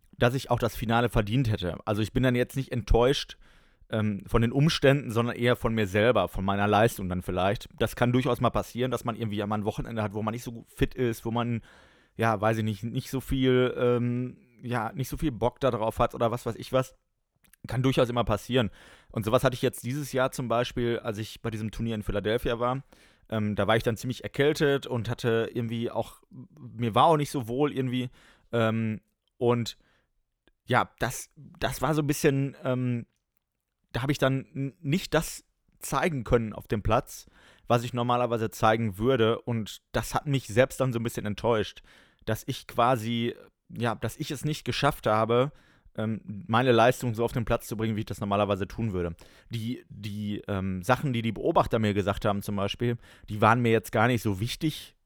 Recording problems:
none

